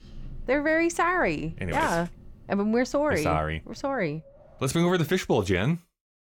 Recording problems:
wind in the background; faint; until 5 s; 25 dB below the speech

